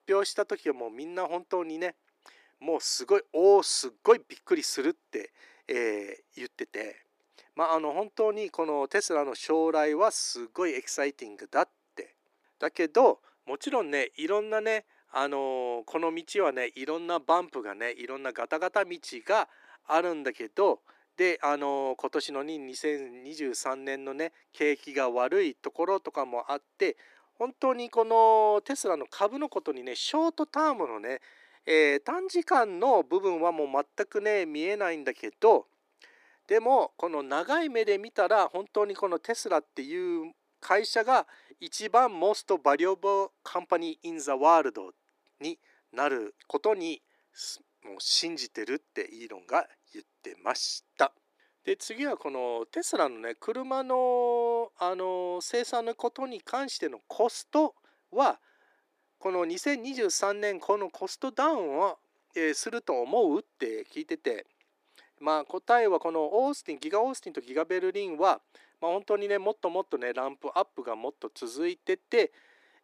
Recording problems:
thin; somewhat; fading below 300 Hz

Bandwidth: 14.5 kHz